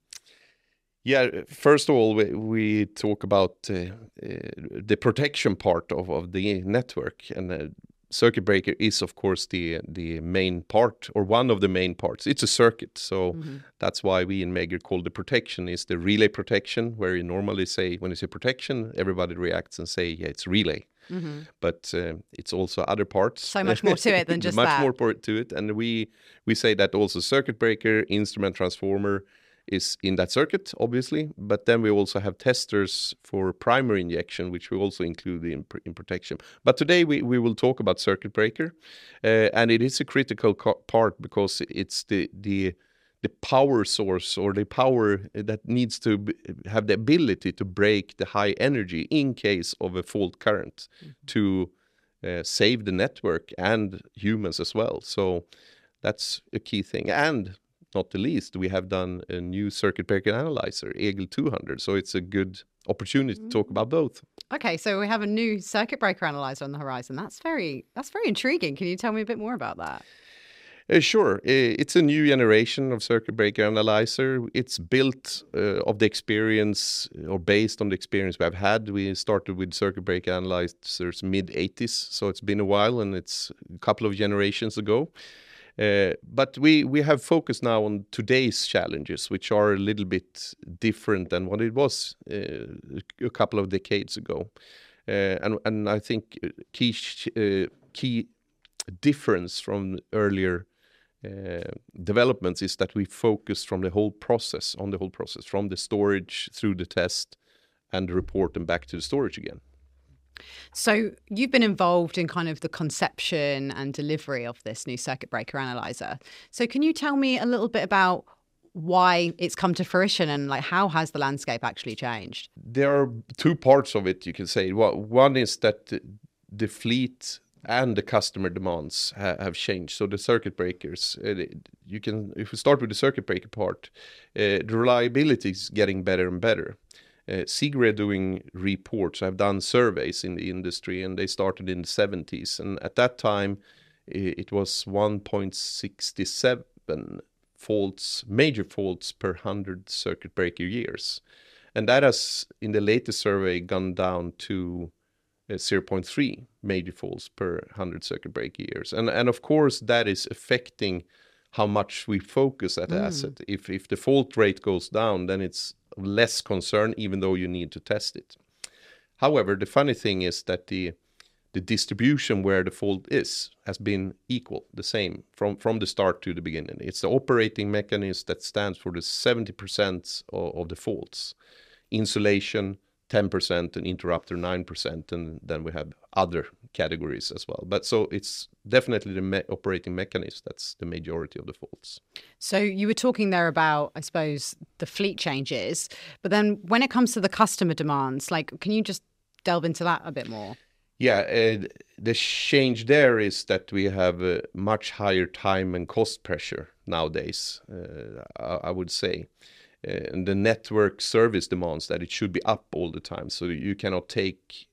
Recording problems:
none

